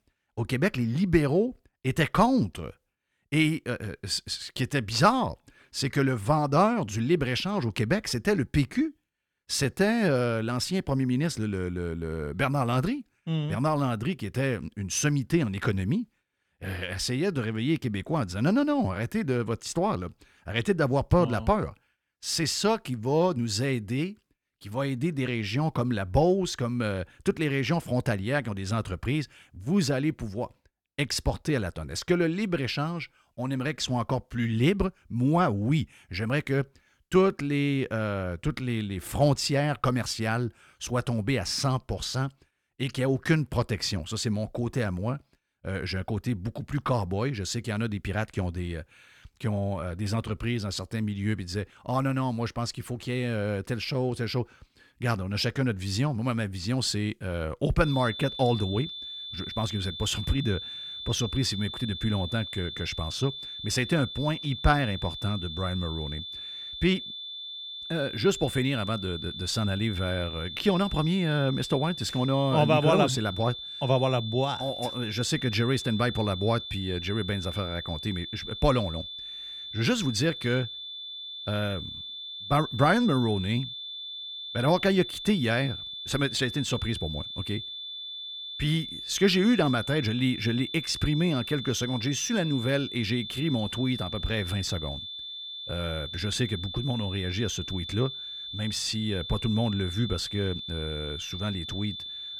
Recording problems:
high-pitched whine; loud; from 58 s on; 3.5 kHz, 8 dB below the speech

